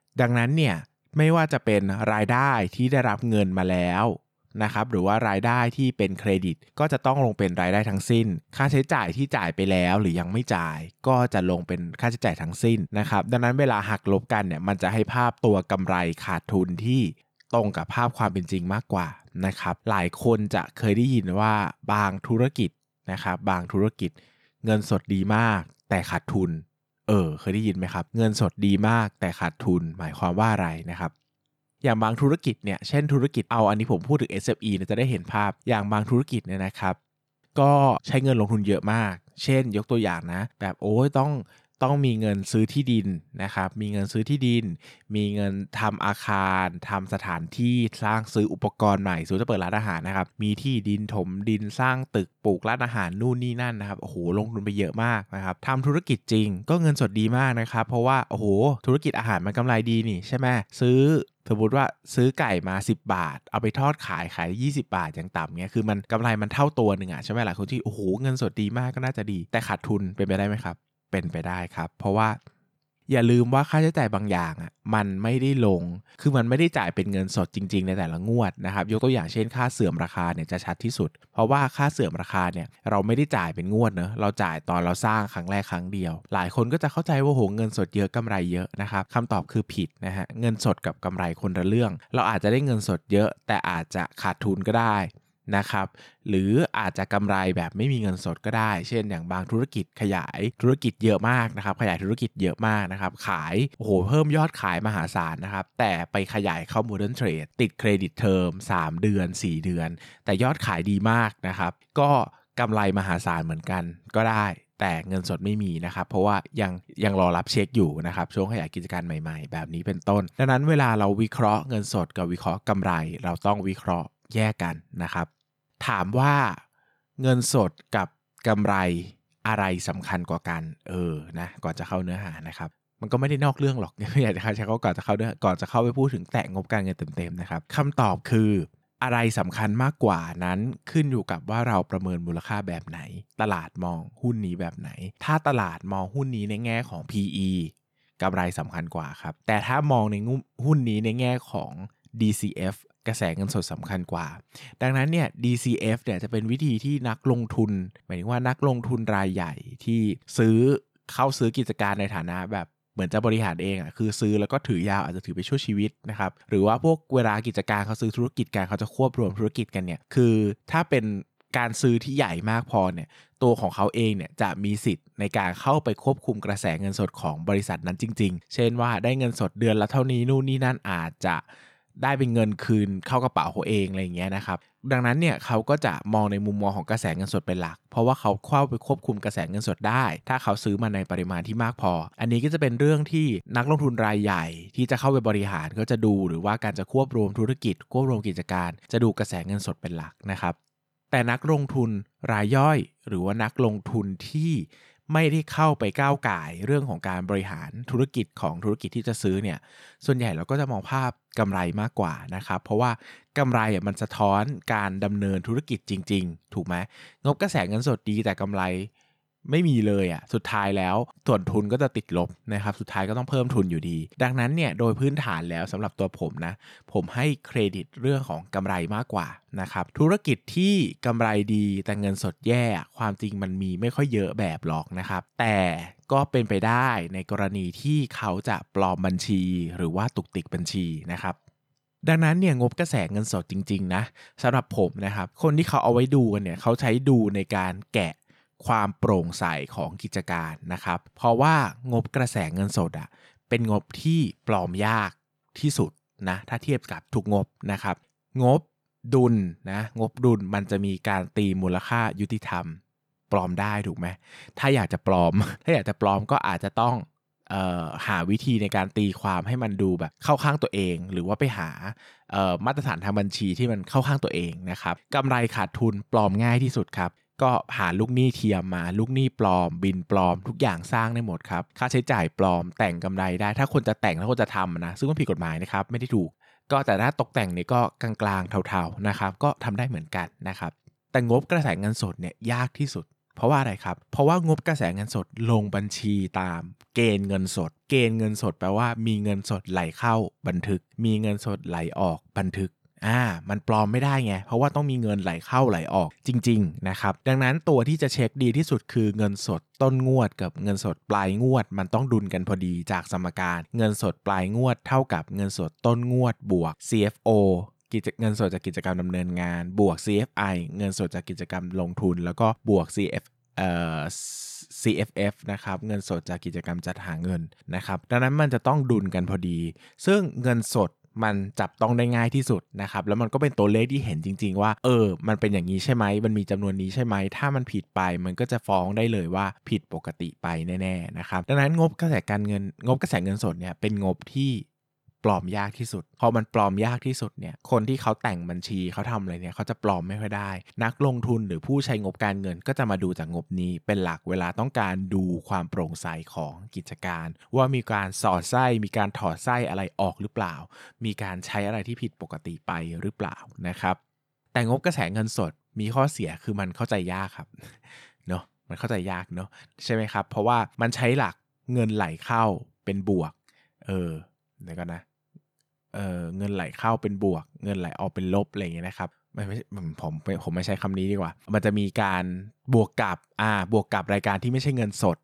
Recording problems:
none

